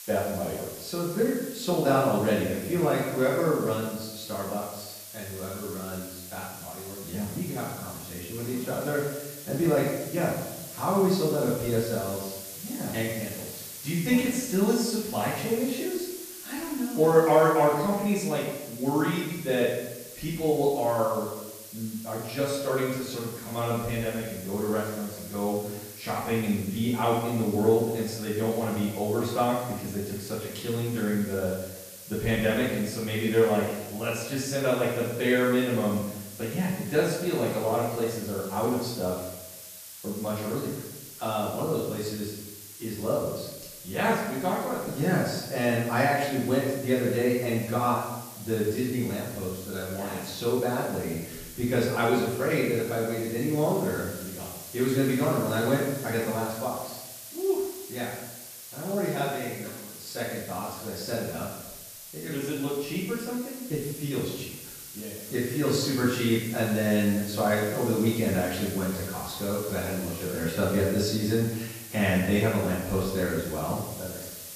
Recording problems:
off-mic speech; far
room echo; noticeable; dies away in 0.9 s
hiss; noticeable; throughout; 10 dB below the speech

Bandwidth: 14.5 kHz